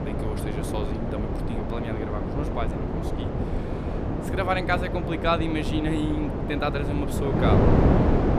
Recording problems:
wind noise on the microphone; heavy; 1 dB below the speech

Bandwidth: 14.5 kHz